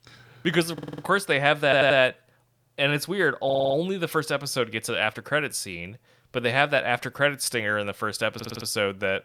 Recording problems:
audio stuttering; 4 times, first at 0.5 s

